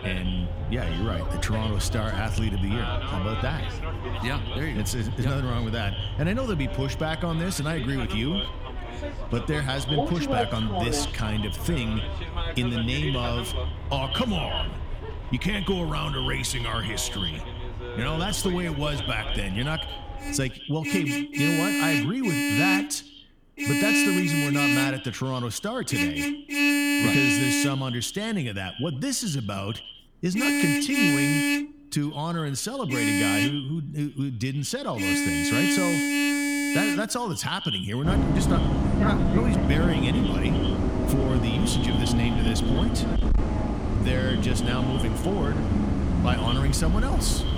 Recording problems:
echo of what is said; strong; throughout; 100 ms later, 10 dB below the speech
traffic noise; very loud; throughout; 2 dB above the speech

